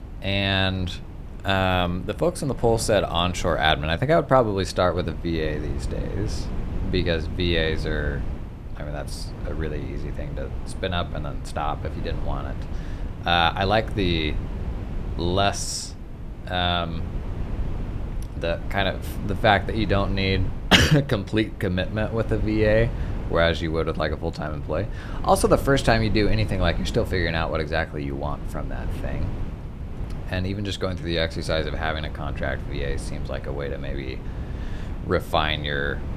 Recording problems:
wind noise on the microphone; occasional gusts; 20 dB below the speech

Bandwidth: 14.5 kHz